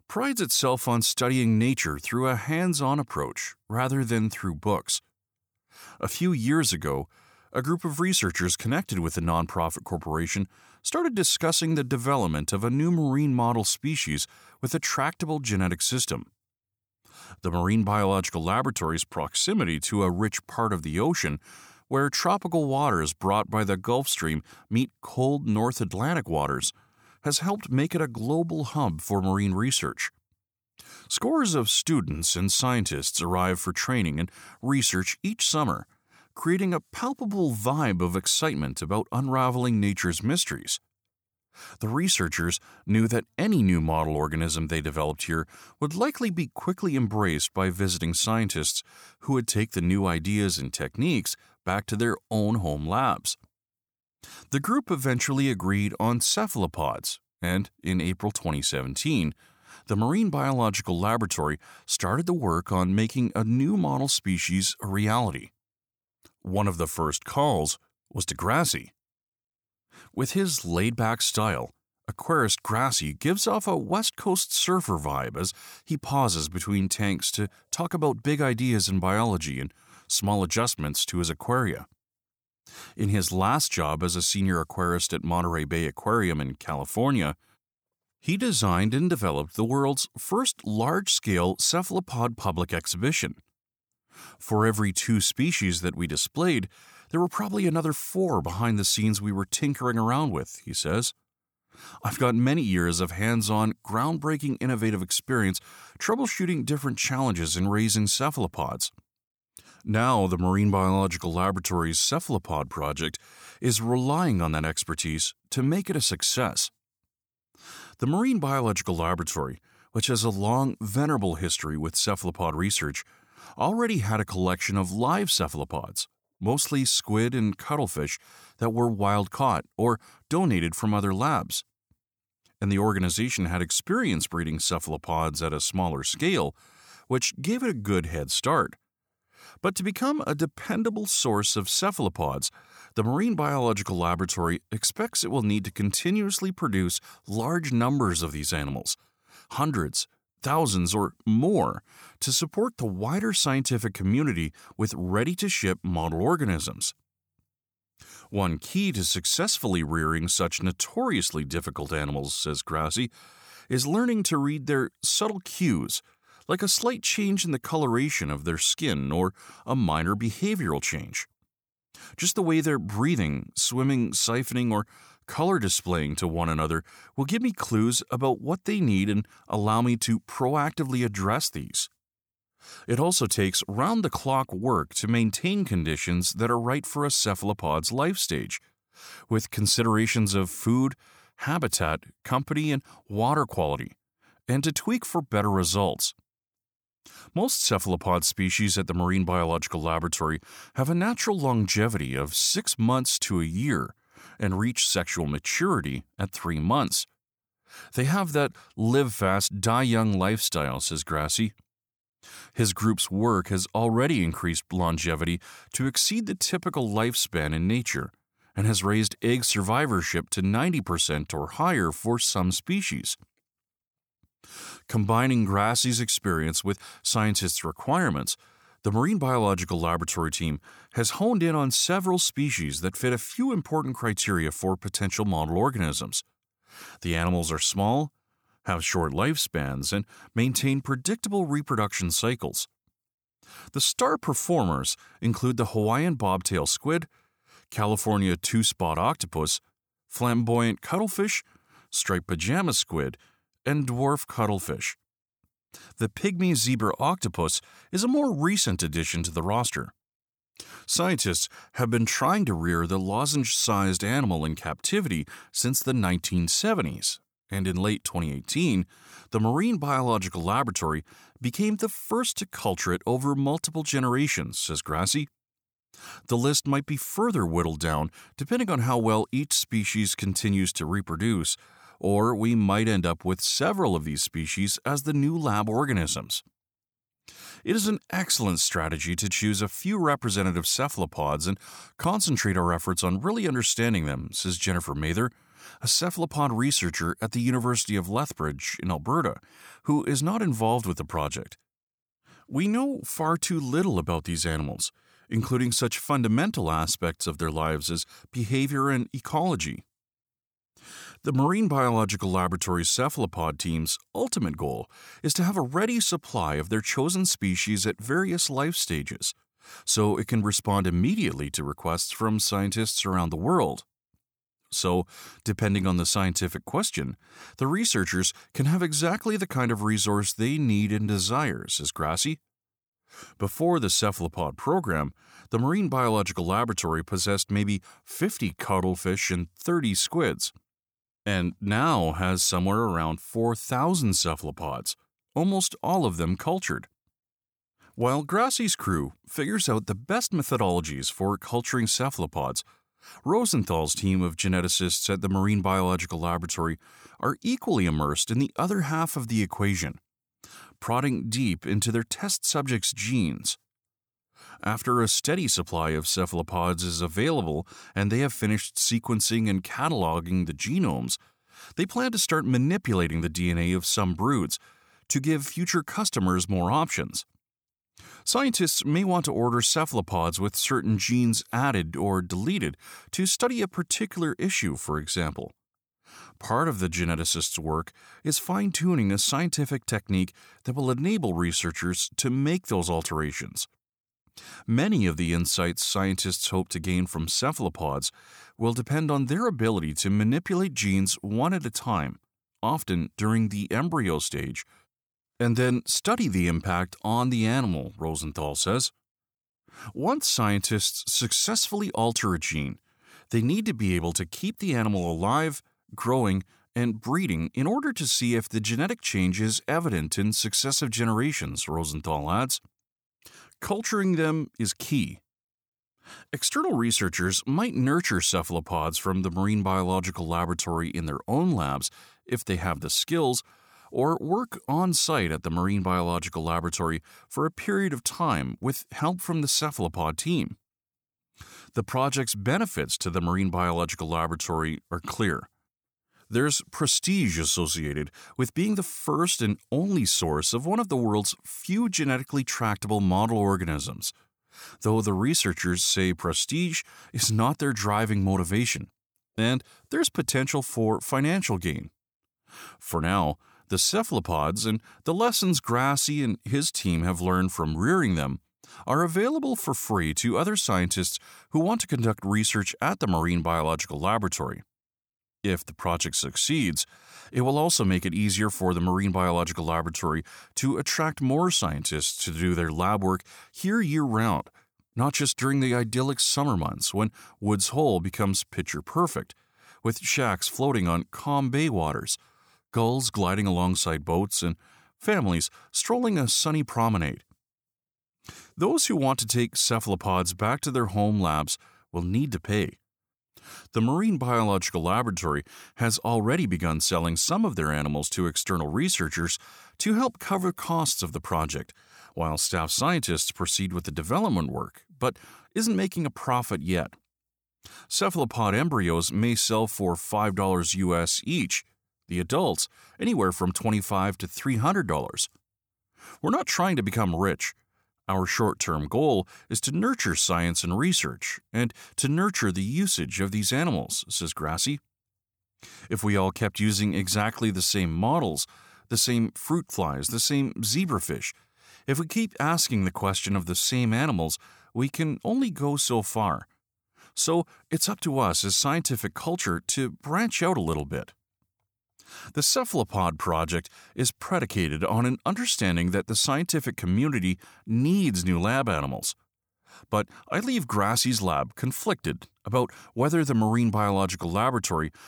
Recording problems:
none

